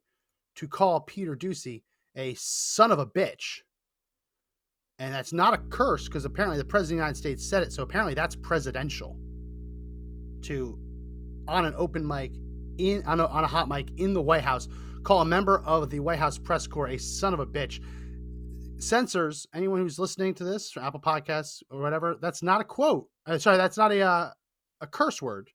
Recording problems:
electrical hum; faint; from 5.5 to 19 s; 60 Hz, 30 dB below the speech

